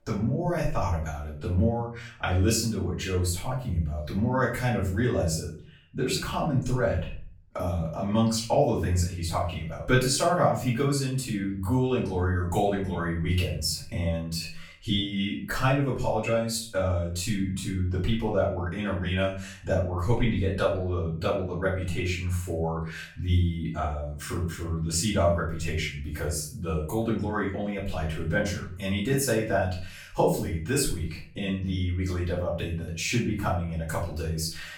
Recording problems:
off-mic speech; far
room echo; noticeable; dies away in 0.4 s

